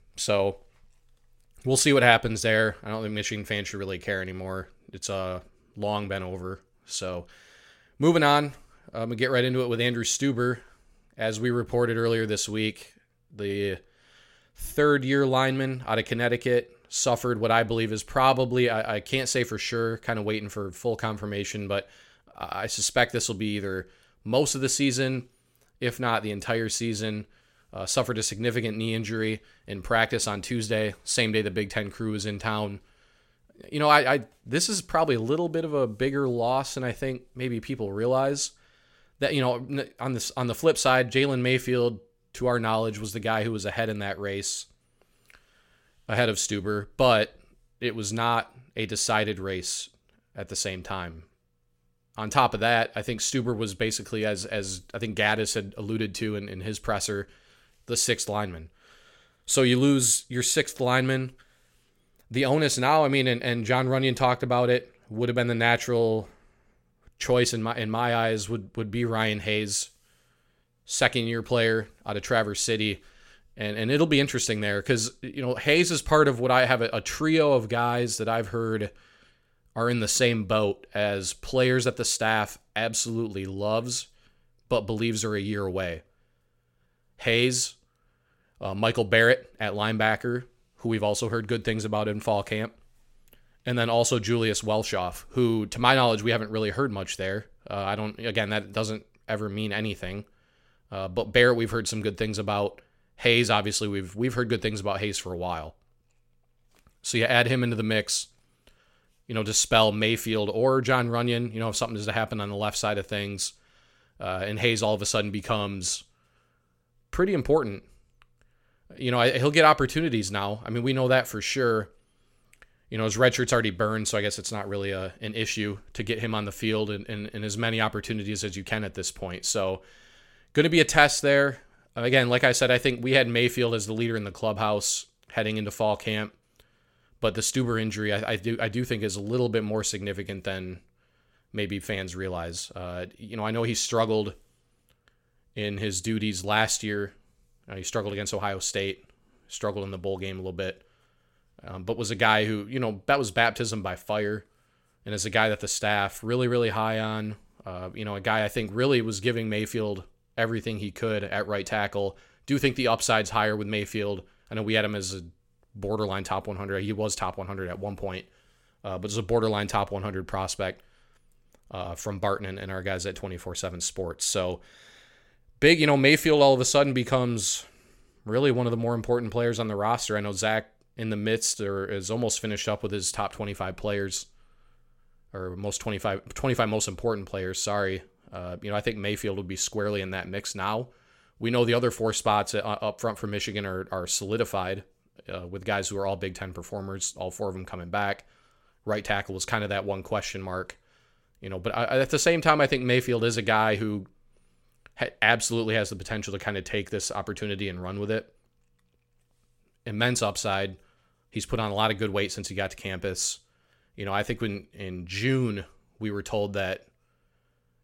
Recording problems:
none

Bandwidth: 16.5 kHz